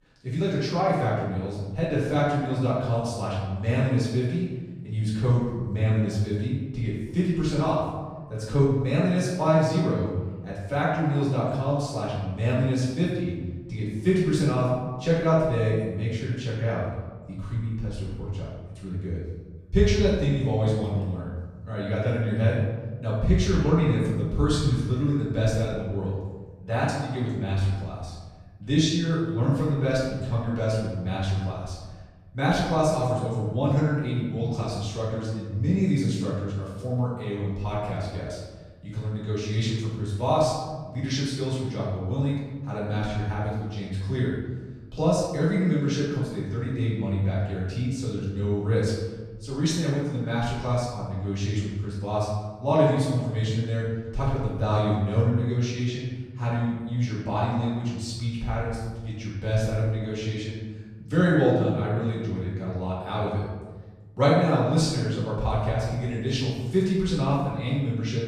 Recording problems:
off-mic speech; far
room echo; noticeable; dies away in 1.3 s

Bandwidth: 14.5 kHz